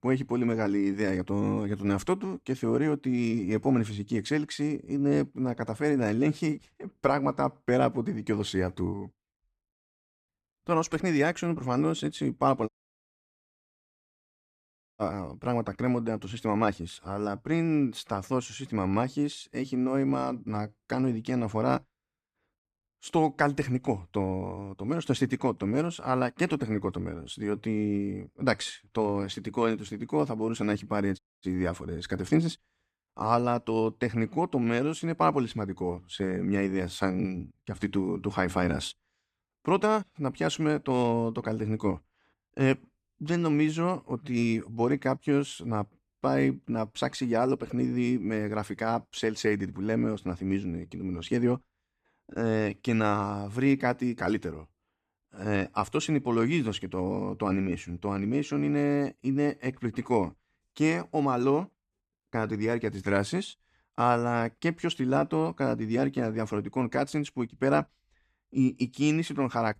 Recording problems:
audio cutting out; at 13 s for 2.5 s and at 31 s

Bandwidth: 14.5 kHz